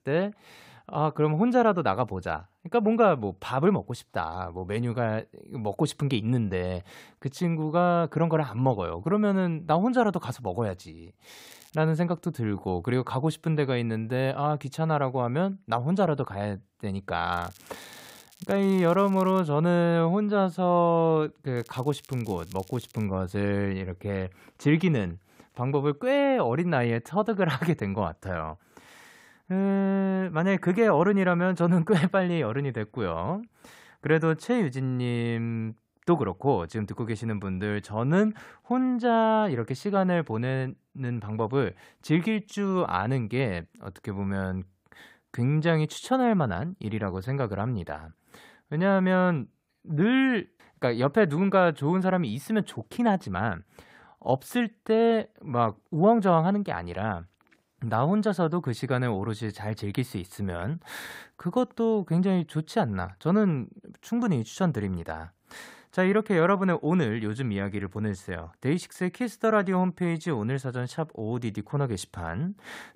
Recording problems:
crackling; faint; at 11 s, from 17 to 19 s and from 22 to 23 s; 25 dB below the speech

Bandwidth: 15.5 kHz